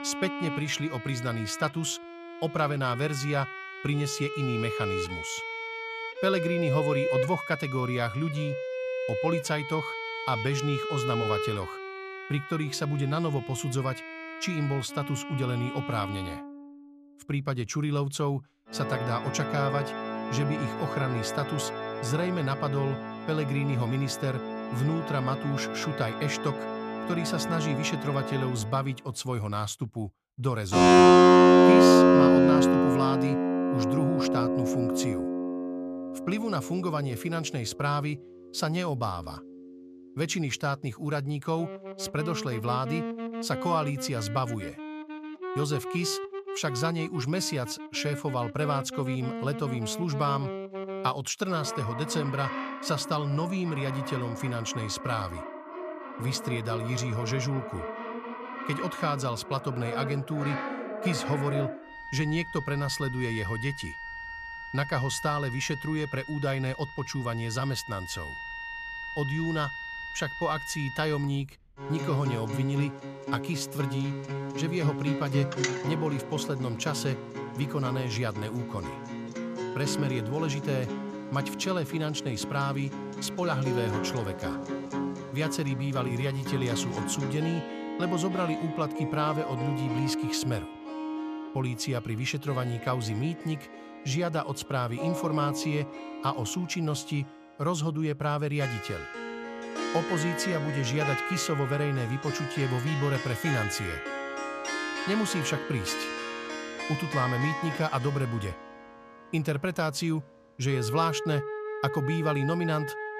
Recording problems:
background music; very loud; throughout; as loud as the speech

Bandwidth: 14.5 kHz